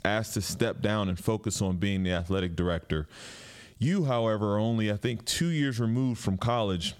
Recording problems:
squashed, flat; heavily

